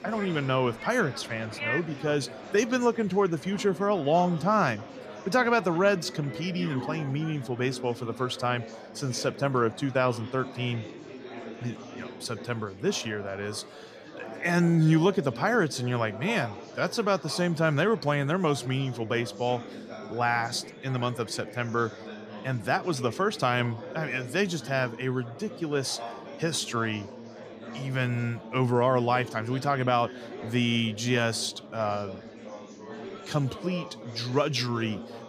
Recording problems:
murmuring crowd; noticeable; throughout; 15 dB below the speech

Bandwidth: 15 kHz